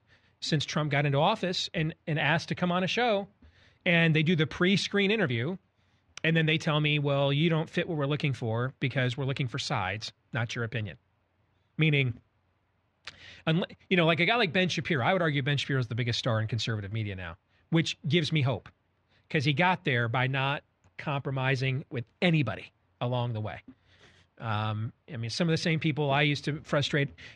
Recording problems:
muffled; slightly; fading above 2.5 kHz

